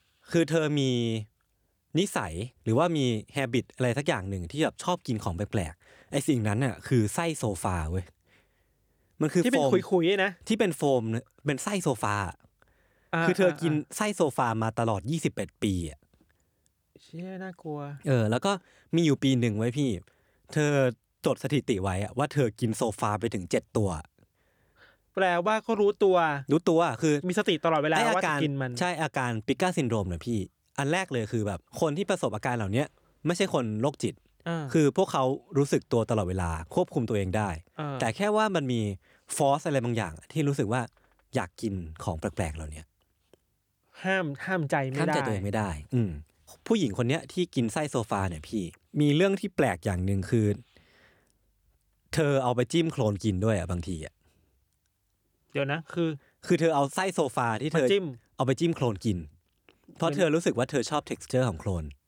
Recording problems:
none

